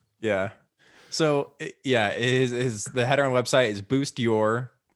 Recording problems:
none

